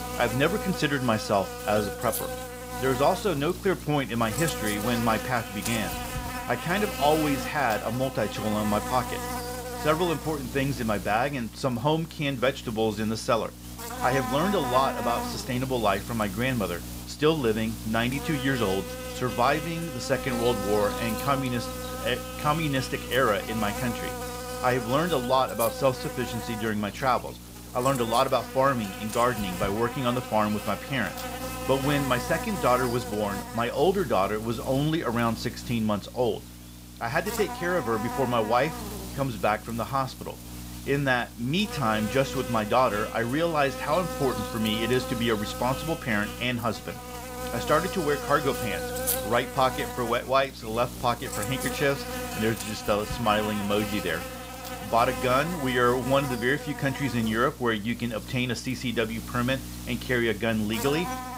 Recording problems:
electrical hum; loud; throughout; 60 Hz, 8 dB below the speech

